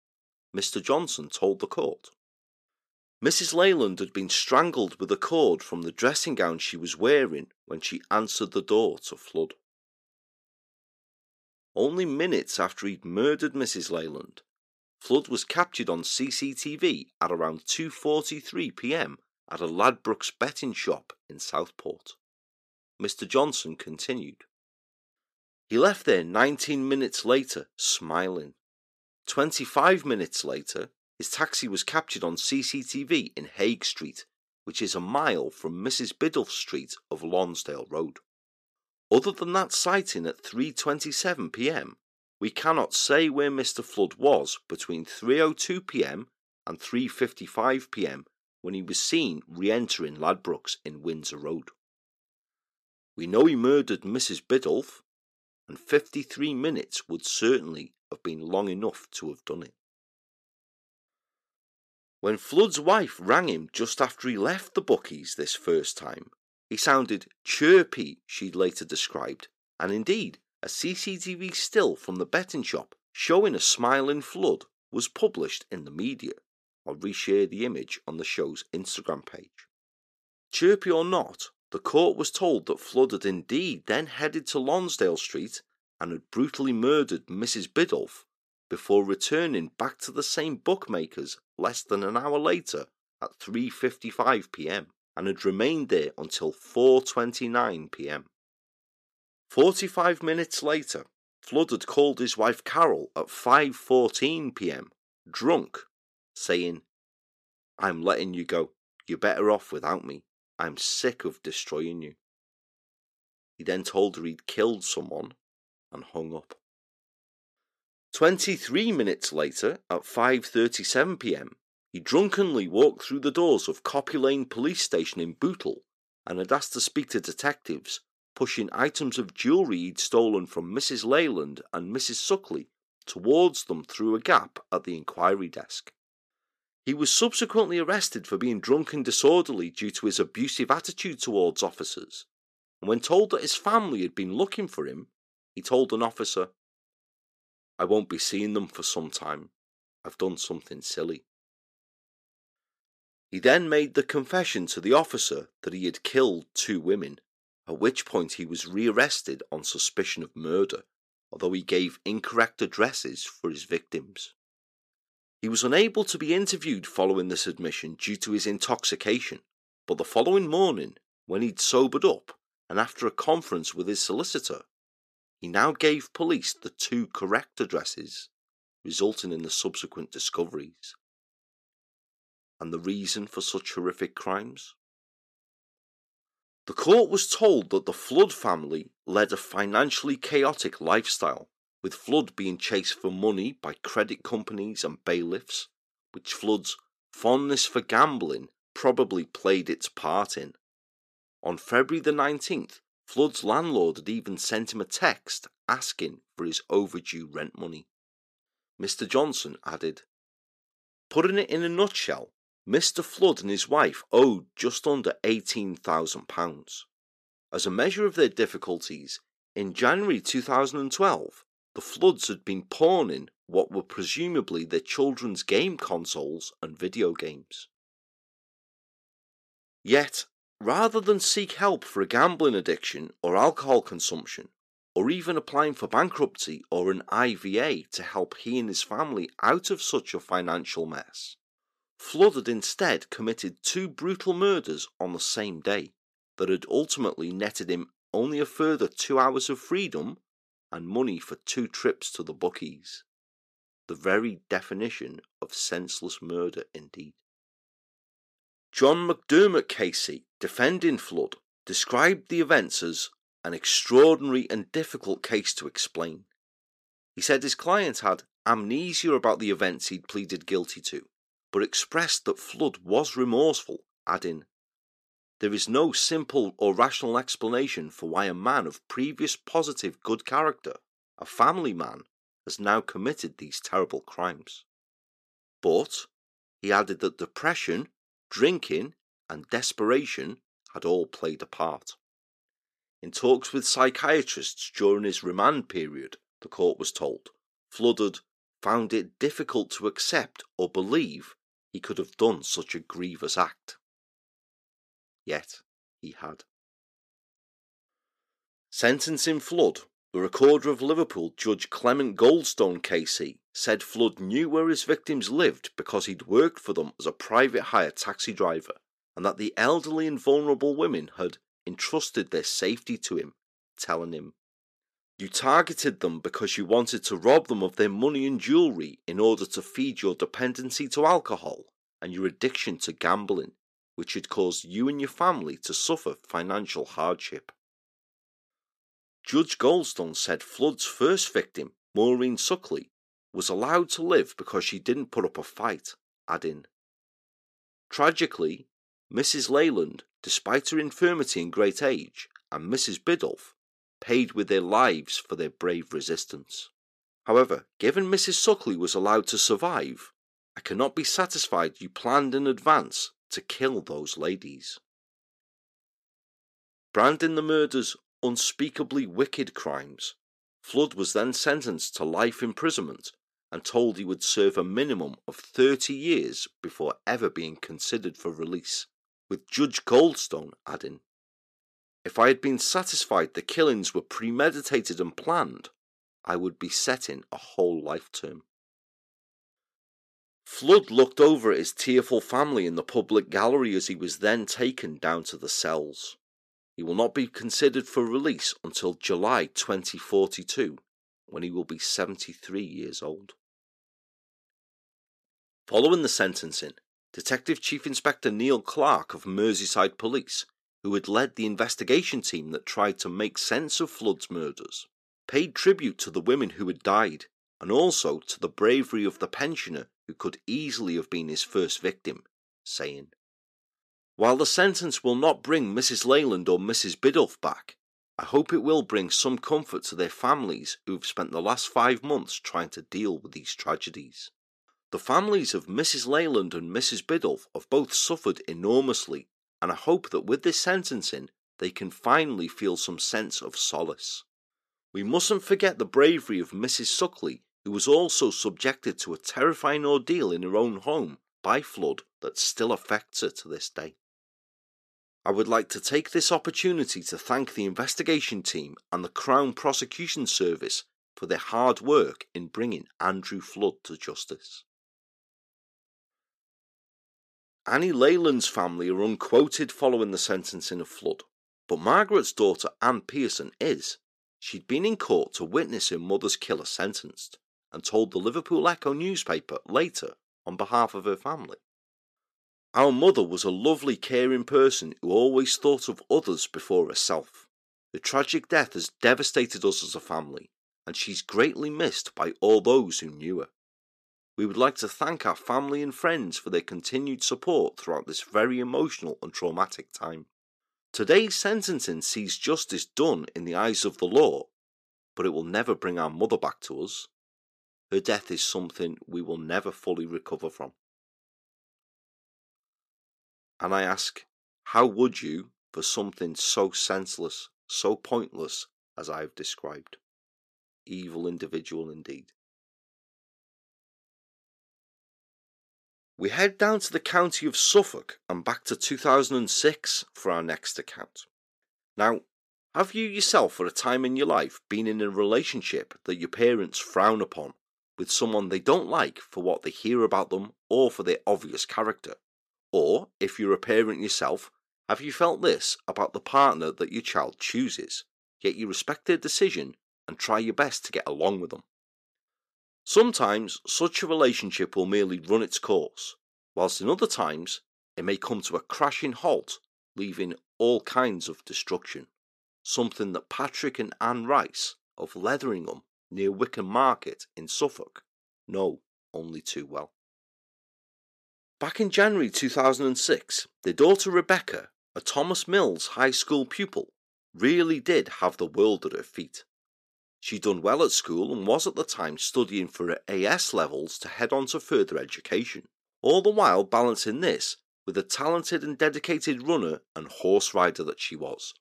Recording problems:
thin; very slightly; fading below 300 Hz

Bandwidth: 14.5 kHz